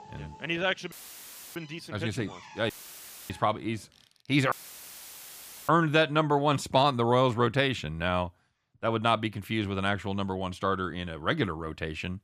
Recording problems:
machinery noise; faint; until 4 s; 25 dB below the speech
audio cutting out; filled with static; at 1 s for 0.5 s, at 2.5 s for 0.5 s and at 4.5 s for 1 s

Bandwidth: 15 kHz